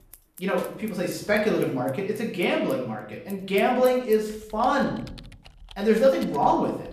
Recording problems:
off-mic speech; far
room echo; noticeable; dies away in 0.6 s
household noises; faint; throughout; 25 dB below the speech

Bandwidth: 14.5 kHz